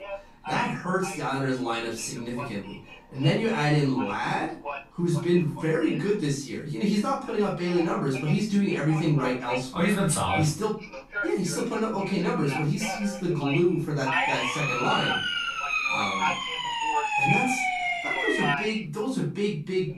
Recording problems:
off-mic speech; far
room echo; slight; dies away in 0.3 s
voice in the background; loud; throughout; 8 dB below the speech
siren; loud; from 14 to 19 s; peak 4 dB above the speech

